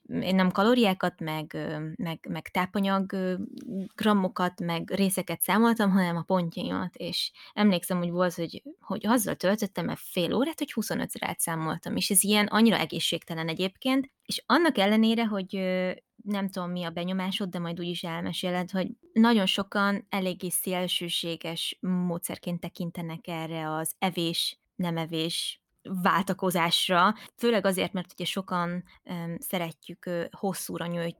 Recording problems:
none

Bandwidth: 18.5 kHz